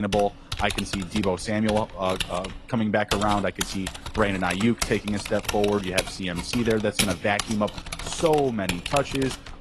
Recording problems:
garbled, watery; slightly
abrupt cut into speech; at the start
keyboard typing; loud; peak level with the speech

